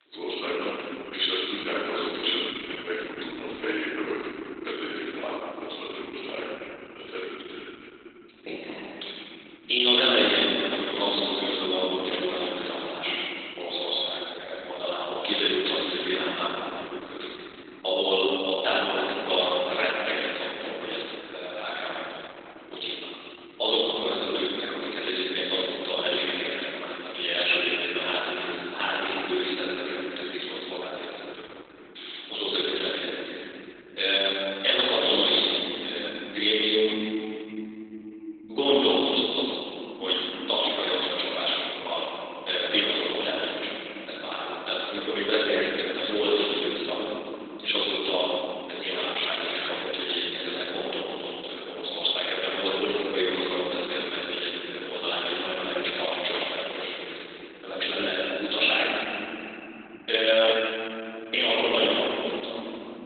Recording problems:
room echo; strong; dies away in 3 s
off-mic speech; far
garbled, watery; badly; nothing above 4 kHz
thin; very slightly; fading below 300 Hz

